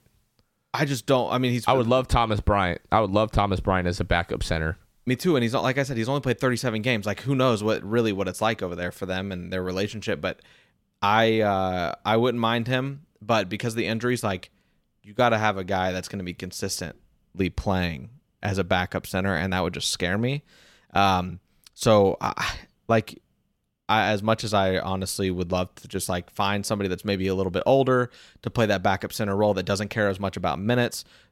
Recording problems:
none

